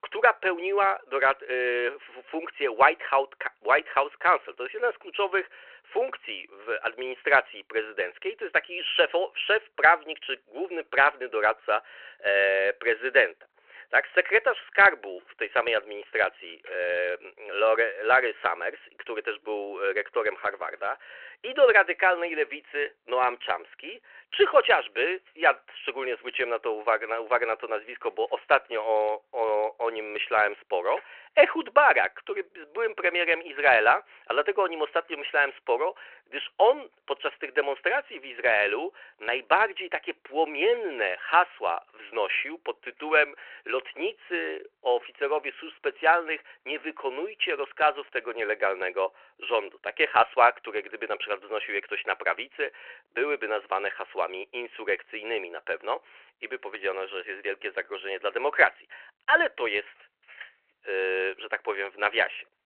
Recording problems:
phone-call audio

